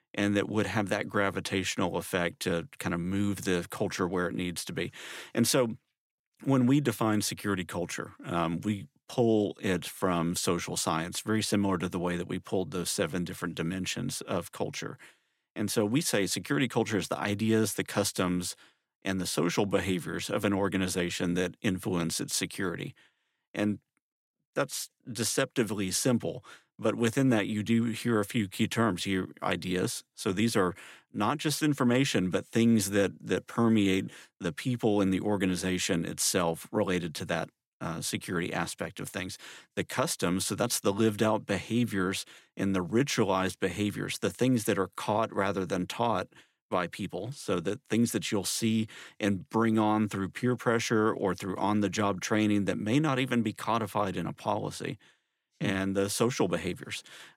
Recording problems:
none

